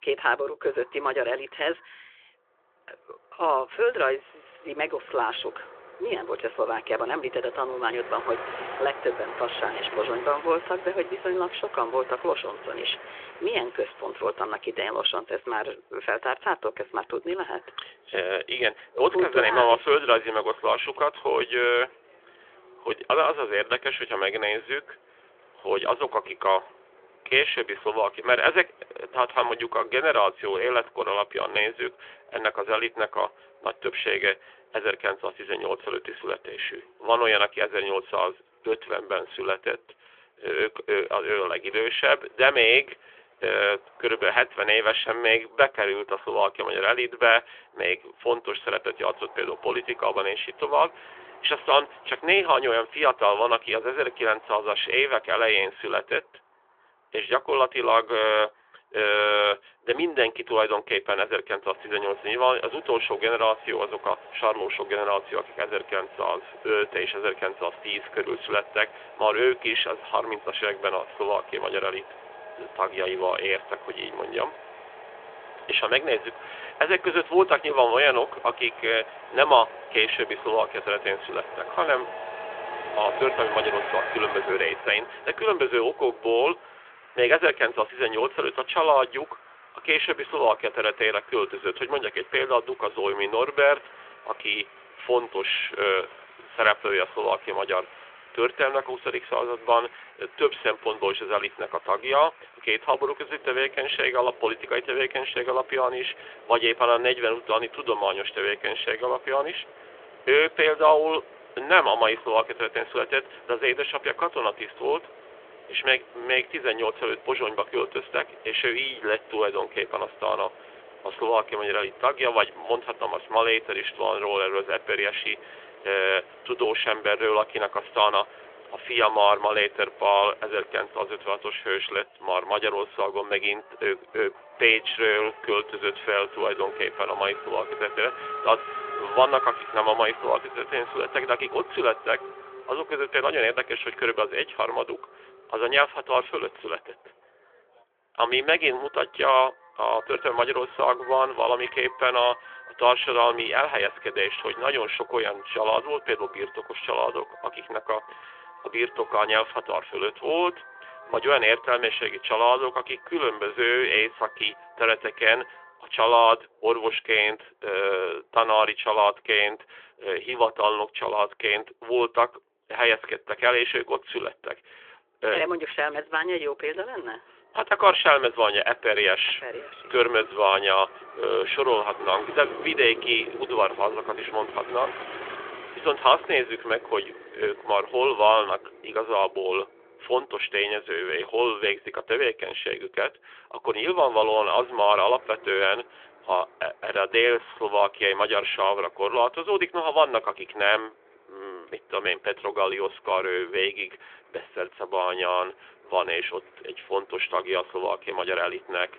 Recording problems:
phone-call audio; nothing above 3.5 kHz
traffic noise; noticeable; throughout; 15 dB below the speech

